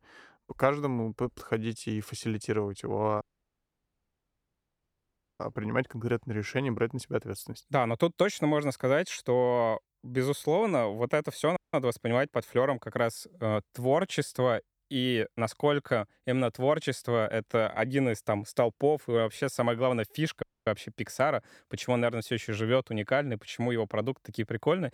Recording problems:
audio cutting out; at 3 s for 2 s, at 12 s and at 20 s

